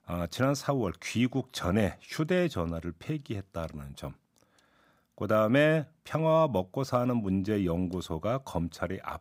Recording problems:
none

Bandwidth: 15.5 kHz